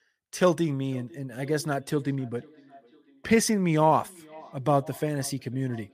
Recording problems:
echo of what is said; faint; throughout; 500 ms later, 25 dB below the speech

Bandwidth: 15 kHz